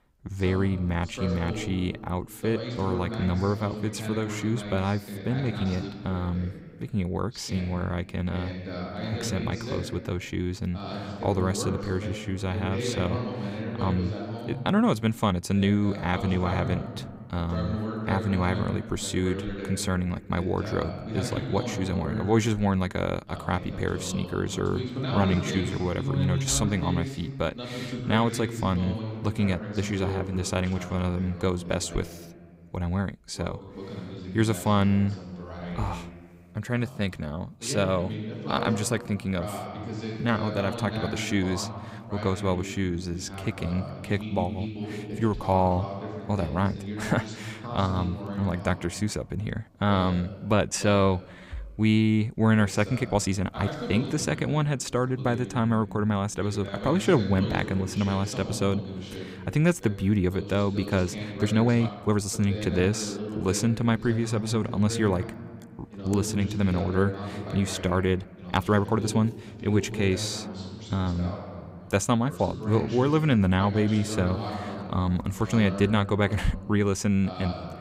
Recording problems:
voice in the background; loud; throughout; 8 dB below the speech
uneven, jittery; strongly; from 5 s to 1:09

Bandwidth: 15.5 kHz